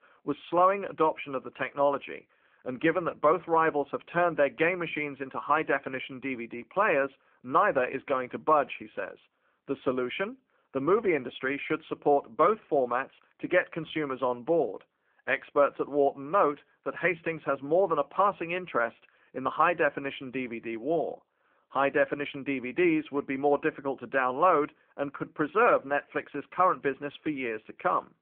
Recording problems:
phone-call audio; nothing above 3.5 kHz

